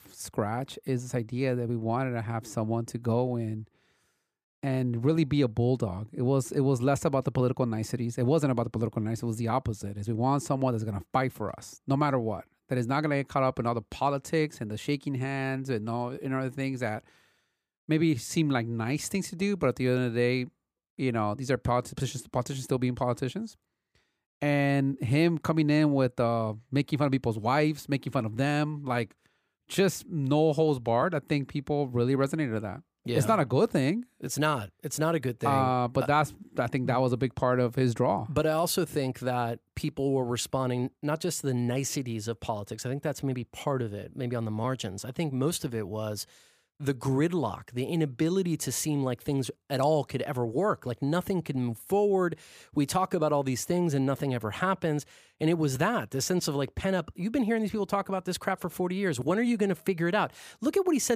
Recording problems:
abrupt cut into speech; at the end

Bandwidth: 15 kHz